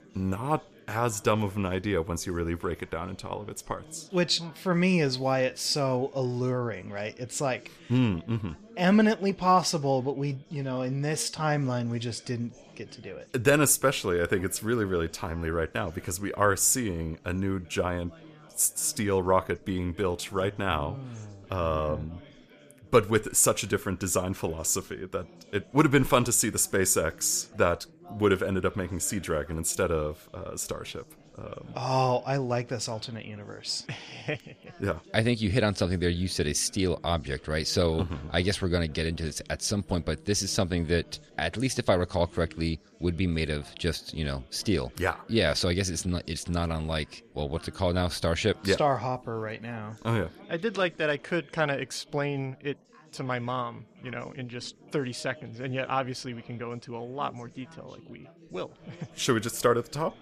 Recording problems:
chatter from many people; faint; throughout; 25 dB below the speech

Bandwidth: 14.5 kHz